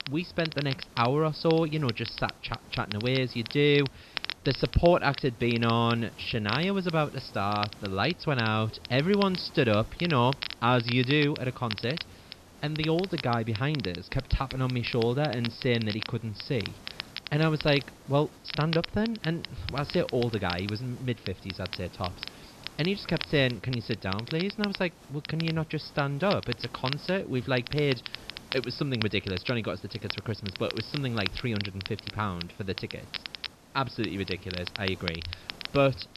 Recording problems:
high frequencies cut off; noticeable; nothing above 5.5 kHz
crackle, like an old record; loud; 10 dB below the speech
hiss; faint; throughout; 20 dB below the speech

